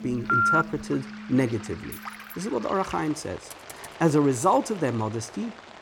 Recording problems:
background music; noticeable; until 2 s; 15 dB below the speech
rain or running water; noticeable; throughout; 15 dB below the speech
phone ringing; loud; at 0.5 s; peak 6 dB above the speech
jangling keys; faint; at 2 s; peak 15 dB below the speech
keyboard typing; faint; at 3.5 s; peak 15 dB below the speech

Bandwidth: 17.5 kHz